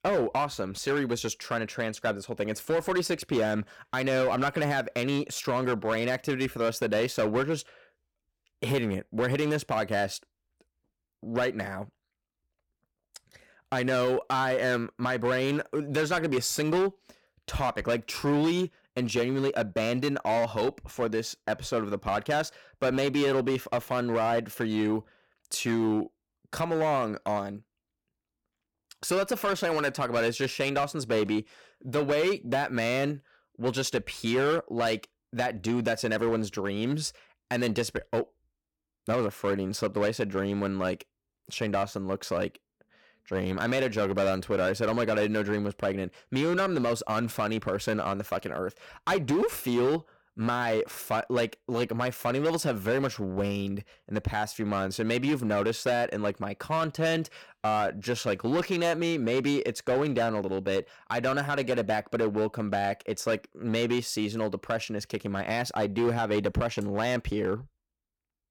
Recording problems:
distortion; slight; 8% of the sound clipped

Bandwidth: 17.5 kHz